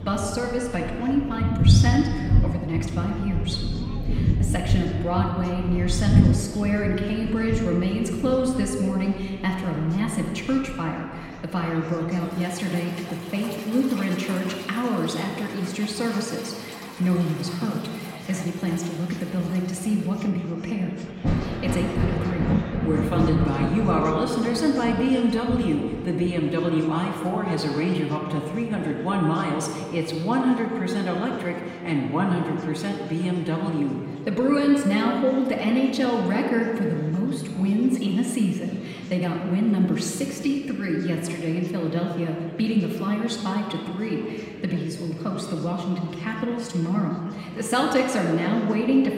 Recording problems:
off-mic speech; far
room echo; noticeable; dies away in 1.8 s
rain or running water; loud; throughout; 2 dB below the speech
chatter from many people; faint; throughout; 20 dB below the speech

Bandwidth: 16 kHz